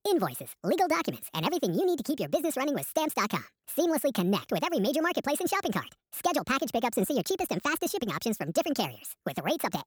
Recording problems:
wrong speed and pitch; too fast and too high; 1.6 times normal speed

